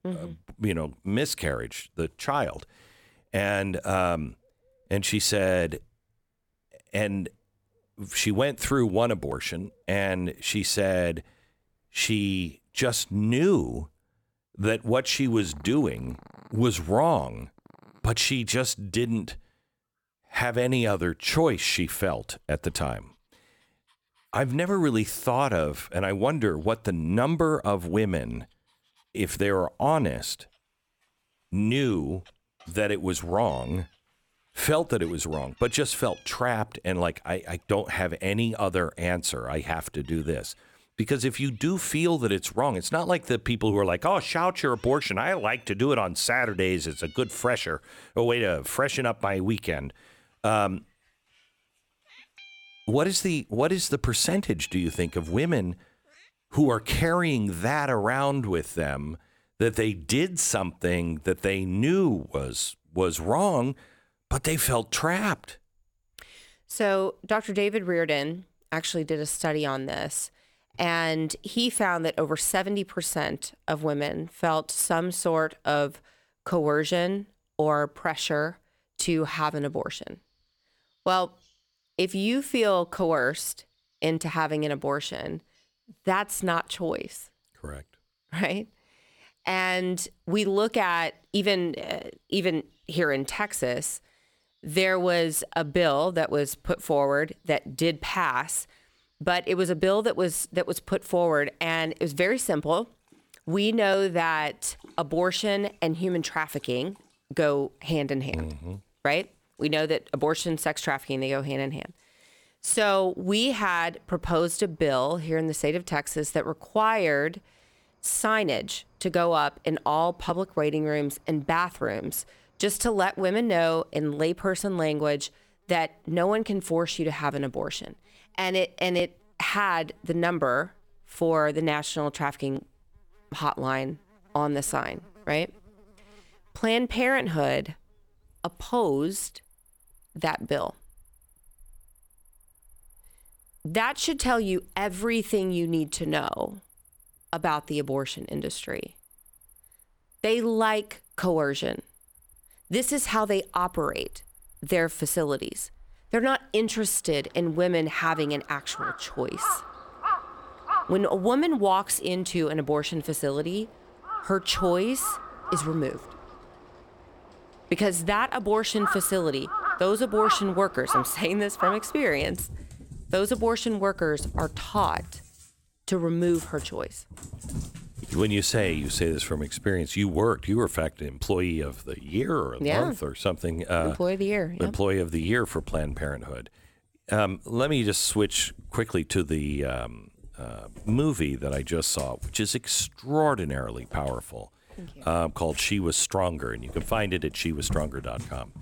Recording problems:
animal sounds; noticeable; throughout; 10 dB below the speech

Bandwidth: 18.5 kHz